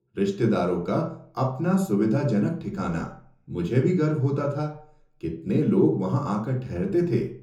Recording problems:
off-mic speech; far
room echo; slight; dies away in 0.5 s

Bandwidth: 18.5 kHz